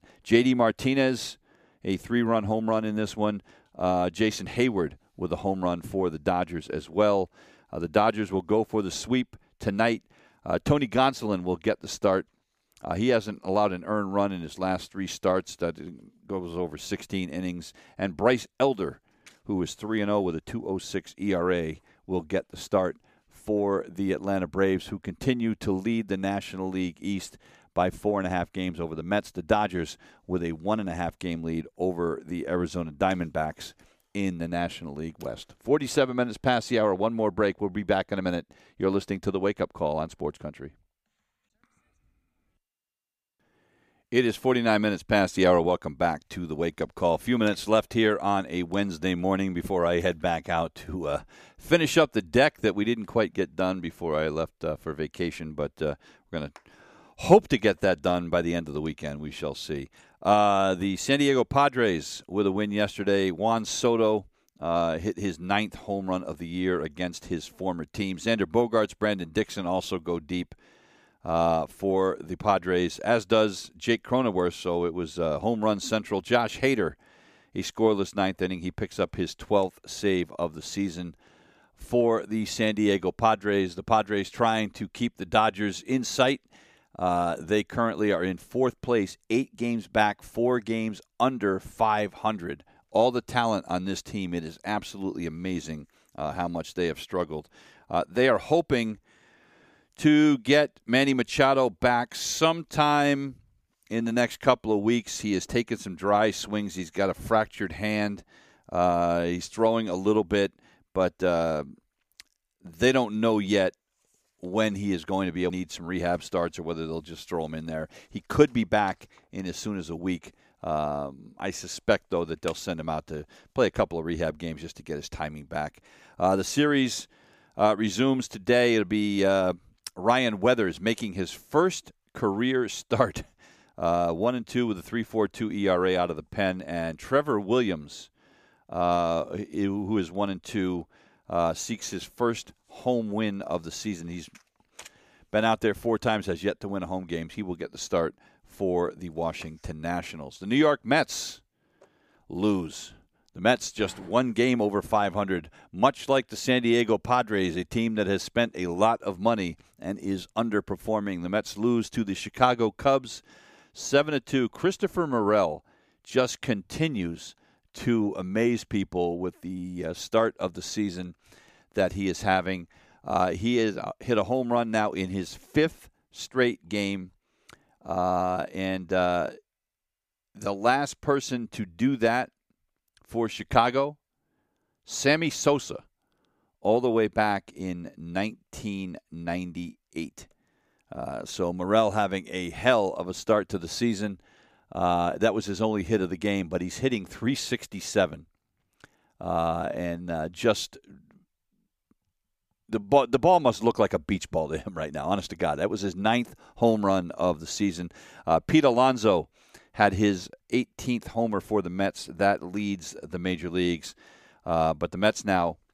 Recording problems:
none

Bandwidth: 15 kHz